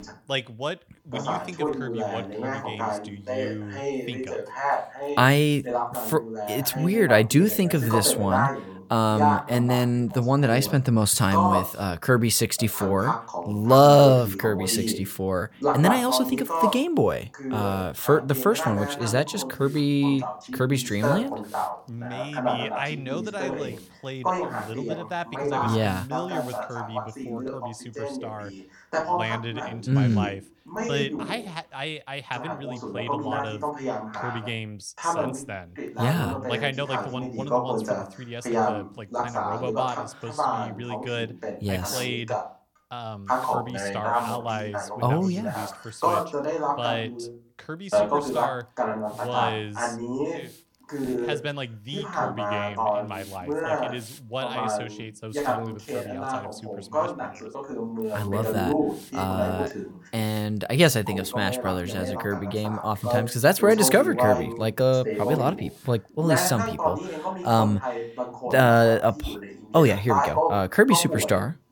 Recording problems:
voice in the background; loud; throughout; 5 dB below the speech
hiss; faint; from 10 to 28 s and from 42 s to 1:07; 25 dB below the speech

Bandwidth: 18 kHz